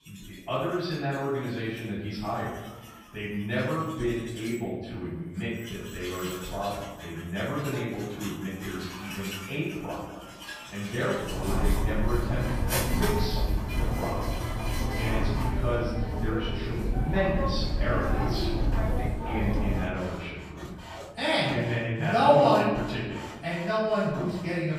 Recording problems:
off-mic speech; far
room echo; noticeable; dies away in 1.1 s
machinery noise; loud; throughout; 2 dB below the speech

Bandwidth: 14.5 kHz